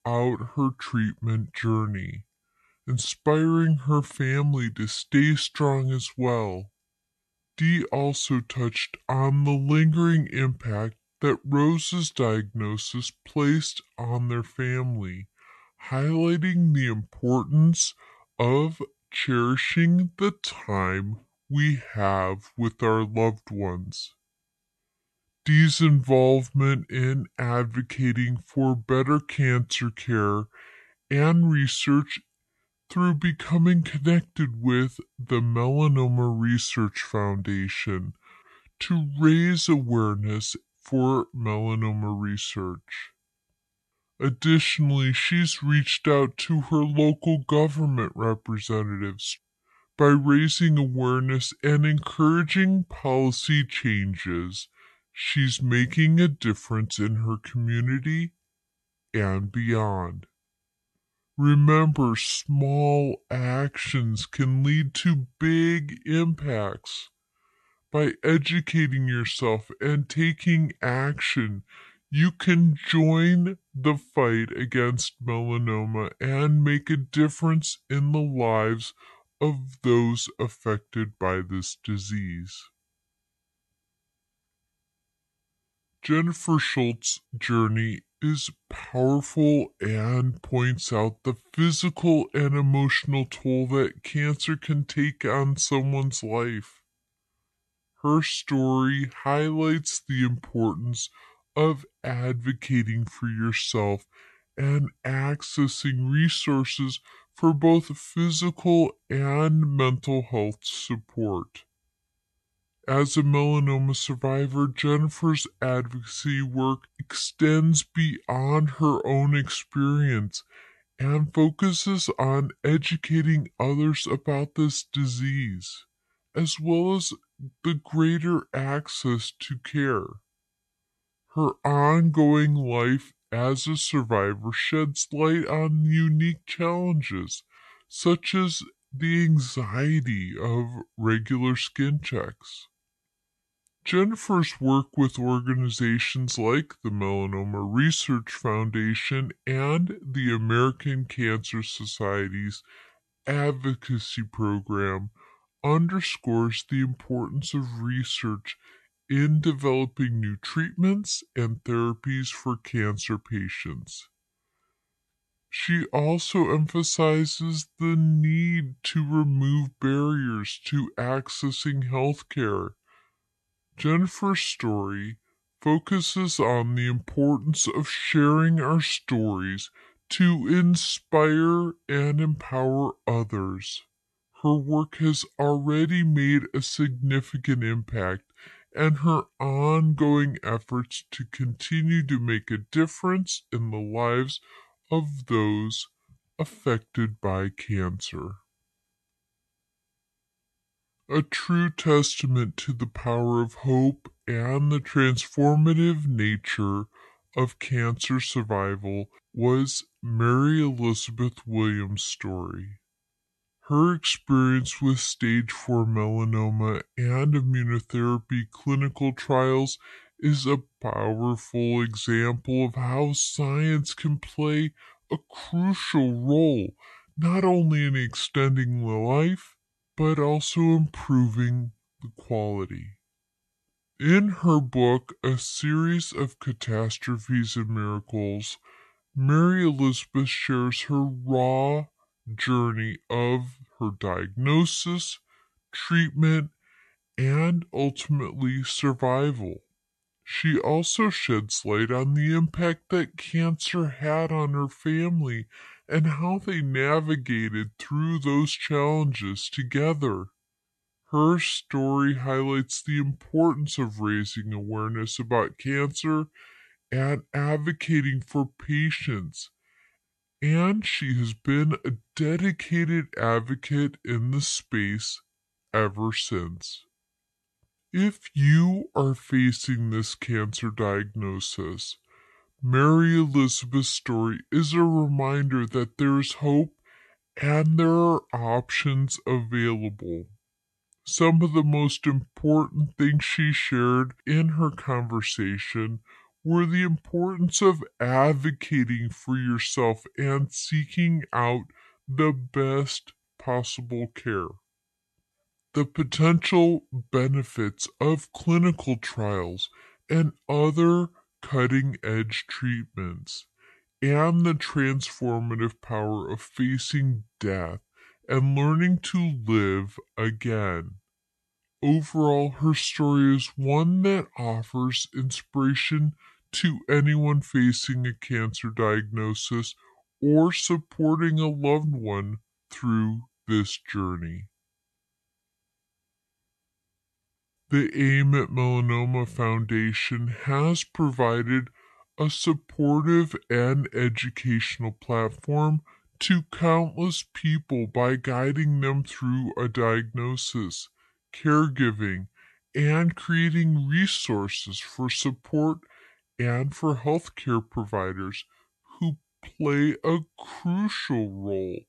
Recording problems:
wrong speed and pitch; too slow and too low; 0.7 times normal speed

